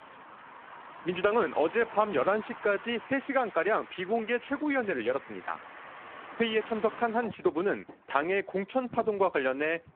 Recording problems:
phone-call audio; poor line
traffic noise; noticeable; throughout; 15 dB below the speech

